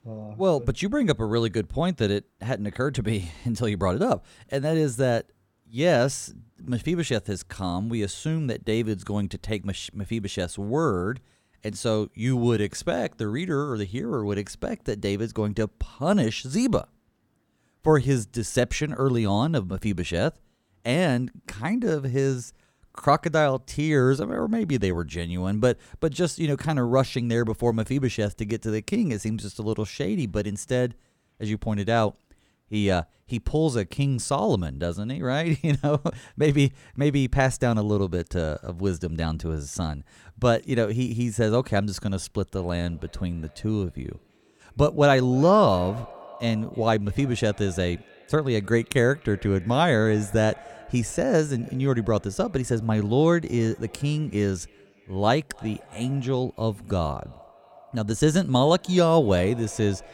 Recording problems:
echo of what is said; faint; from 43 s on; 300 ms later, 20 dB below the speech

